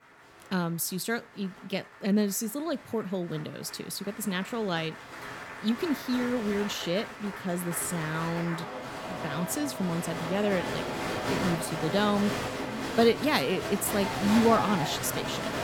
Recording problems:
crowd noise; loud; throughout; 5 dB below the speech

